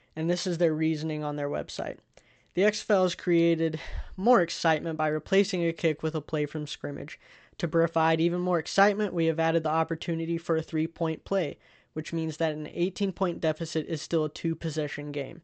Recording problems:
high frequencies cut off; noticeable; nothing above 8 kHz

